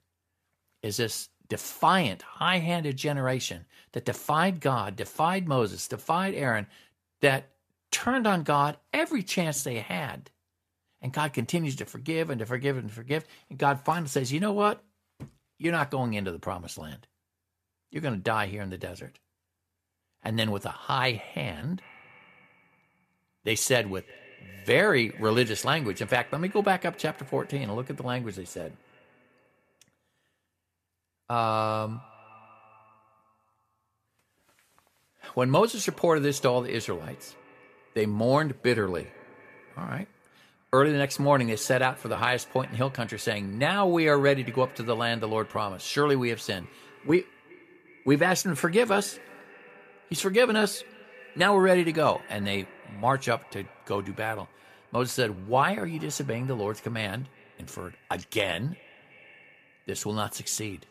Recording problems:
echo of what is said; faint; from 22 s on; 370 ms later, 25 dB below the speech

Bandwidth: 14.5 kHz